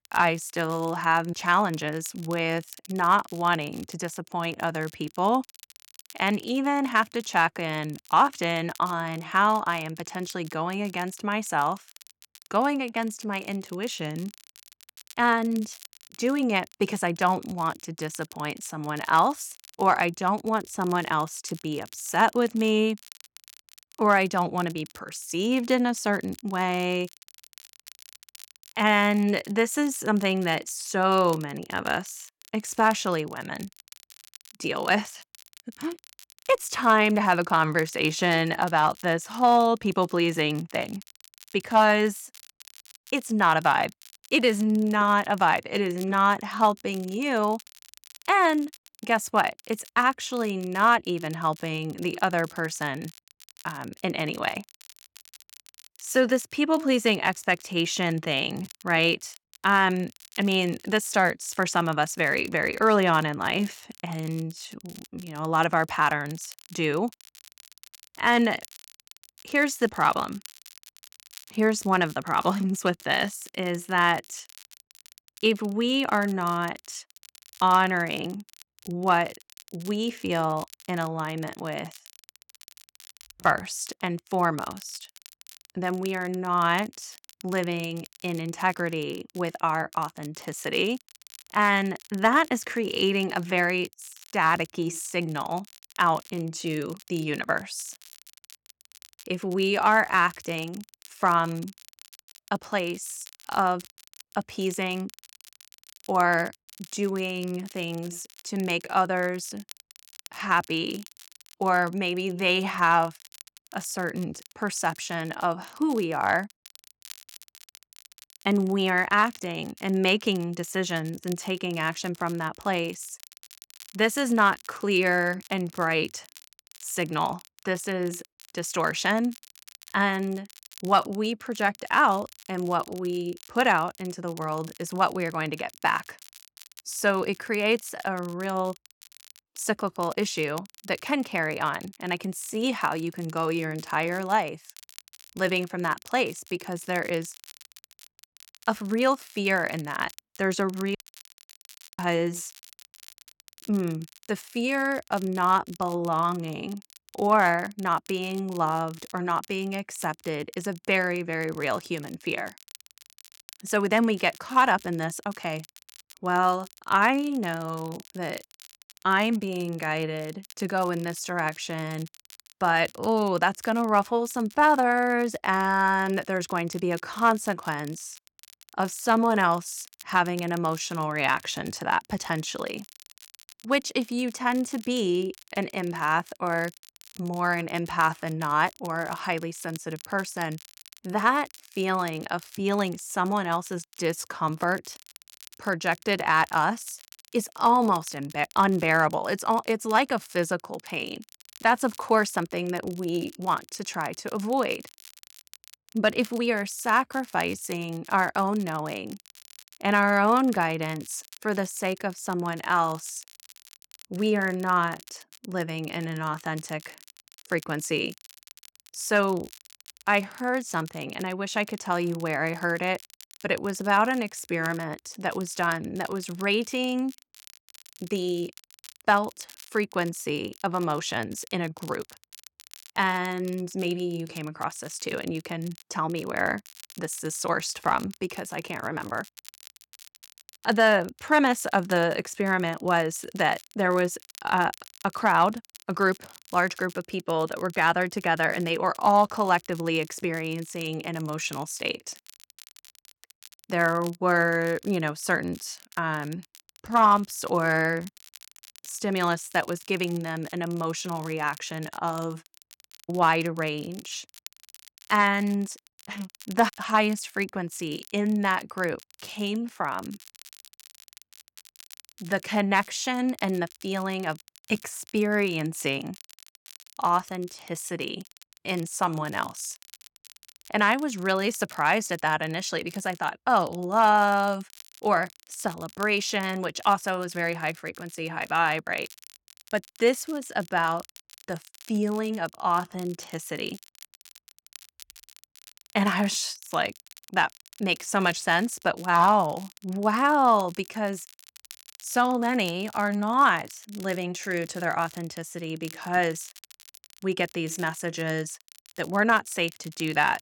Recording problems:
crackle, like an old record; faint; 20 dB below the speech
audio cutting out; at 2:31 for 1 s

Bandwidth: 17.5 kHz